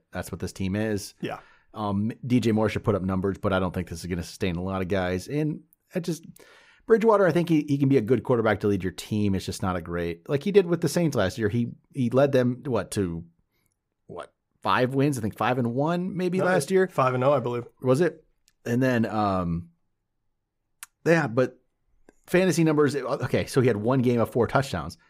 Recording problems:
none

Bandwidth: 15.5 kHz